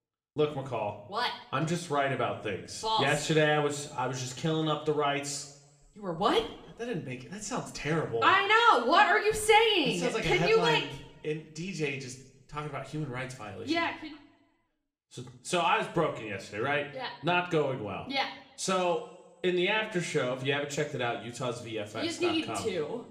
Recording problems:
room echo; slight; dies away in 0.6 s
off-mic speech; somewhat distant

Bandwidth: 14.5 kHz